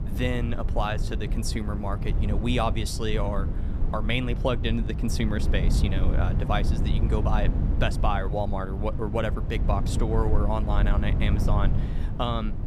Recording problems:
low rumble; loud; throughout; 9 dB below the speech

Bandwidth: 14.5 kHz